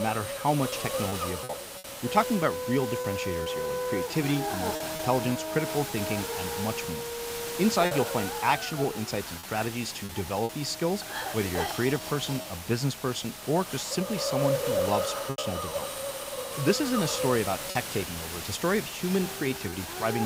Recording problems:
background music; loud; throughout; 7 dB below the speech
hiss; loud; throughout; 4 dB below the speech
background chatter; faint; throughout; 2 voices, 30 dB below the speech
choppy; occasionally; 4% of the speech affected
abrupt cut into speech; at the start and the end

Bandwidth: 15.5 kHz